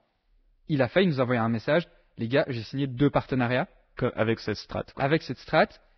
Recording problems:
garbled, watery; badly; nothing above 5.5 kHz

